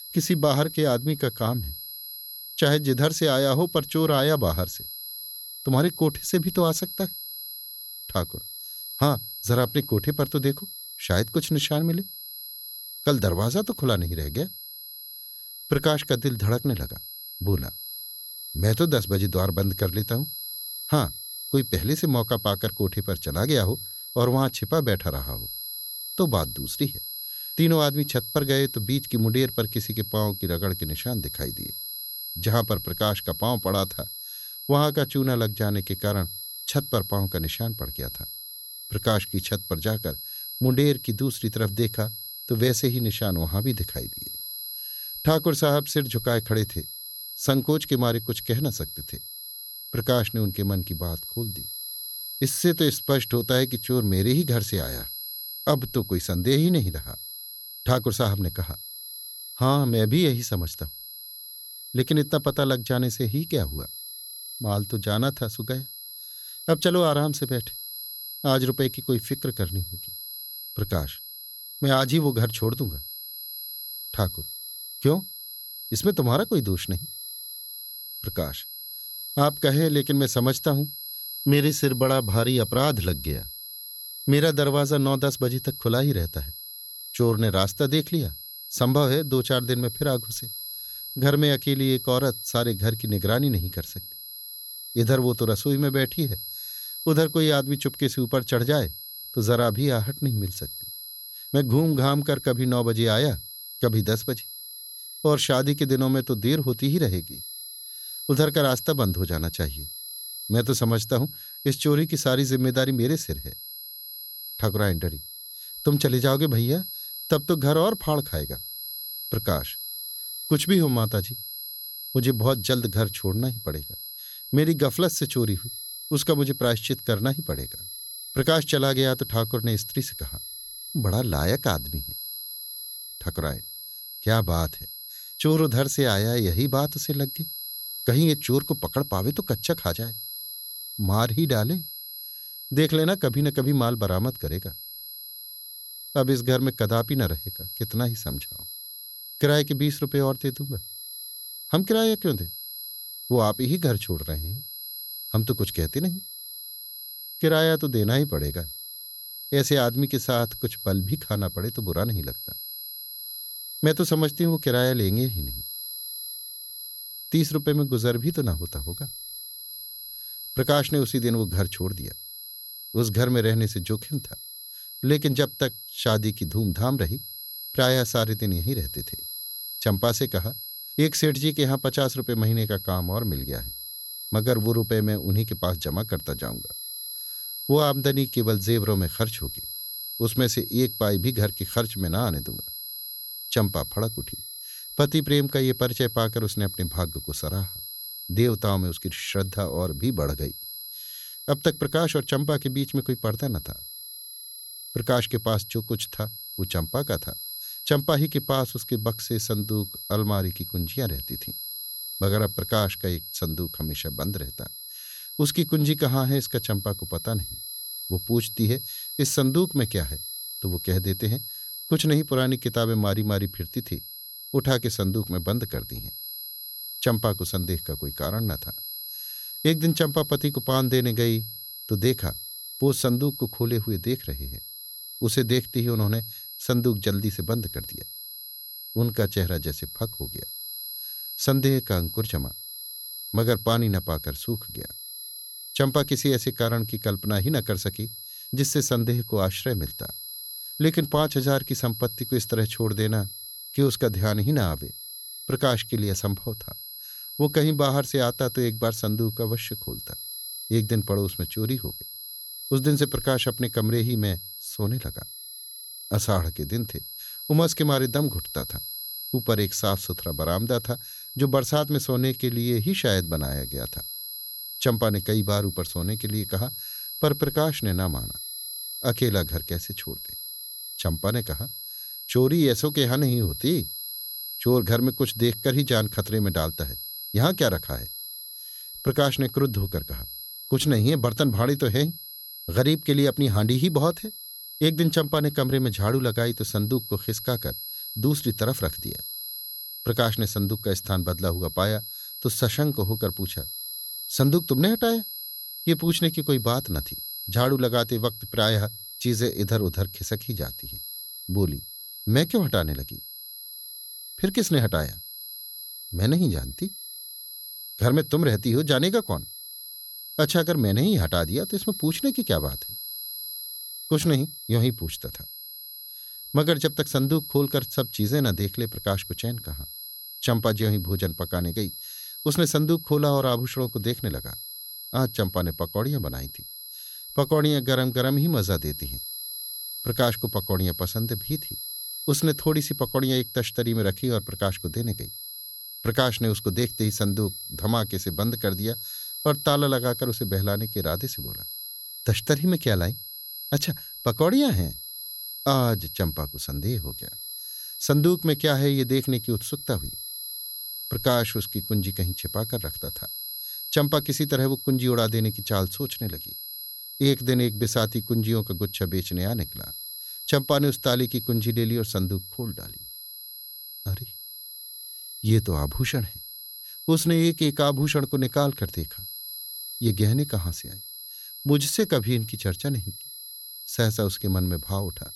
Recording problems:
high-pitched whine; loud; throughout; 11.5 kHz, 9 dB below the speech

